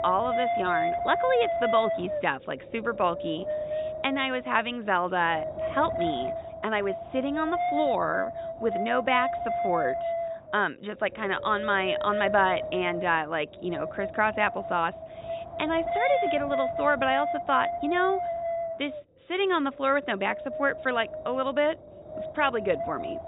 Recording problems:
high frequencies cut off; severe; nothing above 4 kHz
wind noise on the microphone; heavy; 4 dB below the speech

